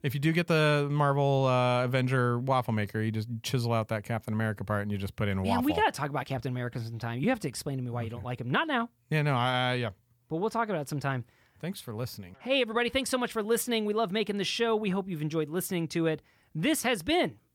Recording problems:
none

